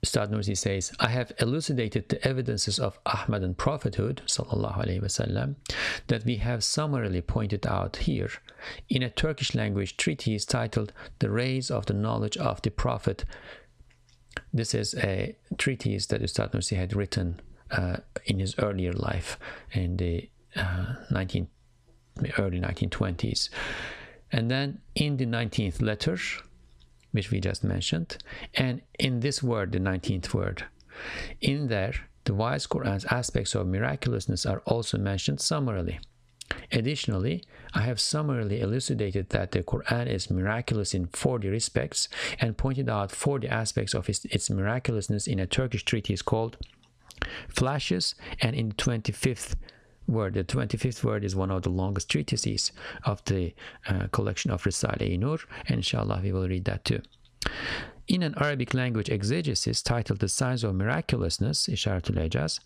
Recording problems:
squashed, flat; heavily

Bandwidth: 15 kHz